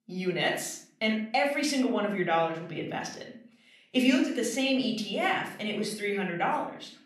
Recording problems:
room echo; slight; dies away in 0.5 s
off-mic speech; somewhat distant

